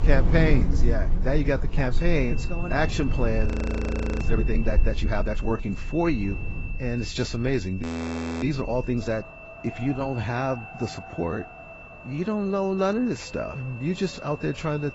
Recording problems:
garbled, watery; badly; nothing above 7.5 kHz
wind in the background; loud; throughout; 2 dB below the speech
high-pitched whine; noticeable; from 2 s on; 2.5 kHz, 15 dB below the speech
audio freezing; at 3.5 s for 1 s and at 8 s for 0.5 s

